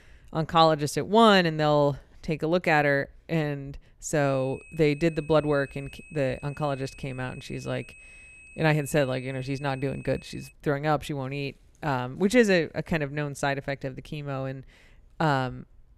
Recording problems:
high-pitched whine; faint; from 4.5 to 11 s; 2.5 kHz, 20 dB below the speech

